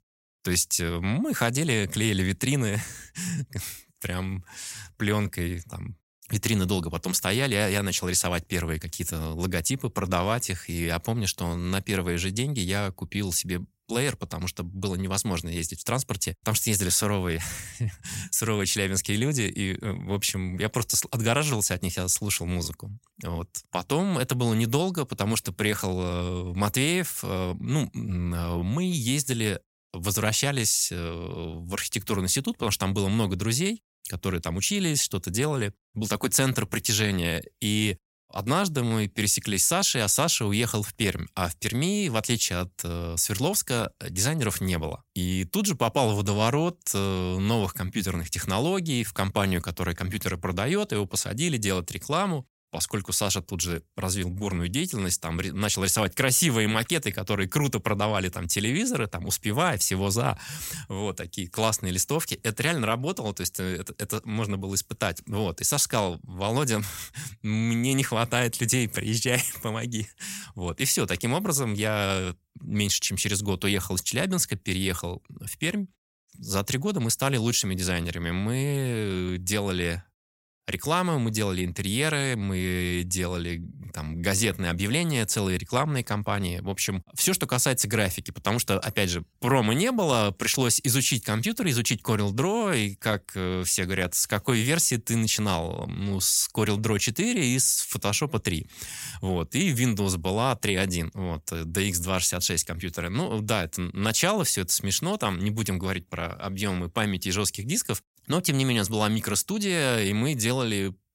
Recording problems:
none

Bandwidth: 16 kHz